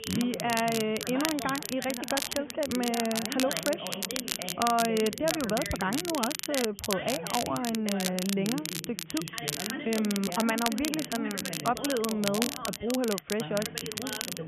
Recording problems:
high frequencies cut off; severe; nothing above 3.5 kHz
background chatter; loud; throughout; 2 voices, 9 dB below the speech
crackle, like an old record; loud; 3 dB below the speech

